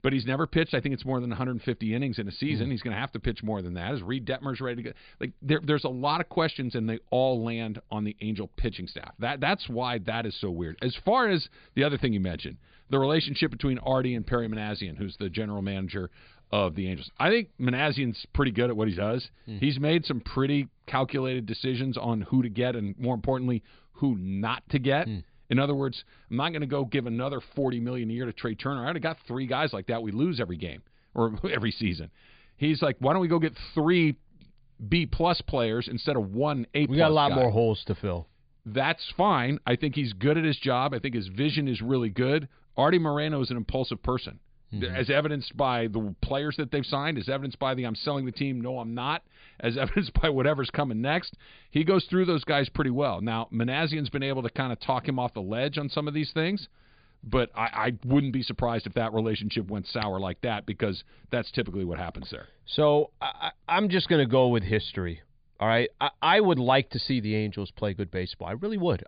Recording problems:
high frequencies cut off; severe; nothing above 4.5 kHz

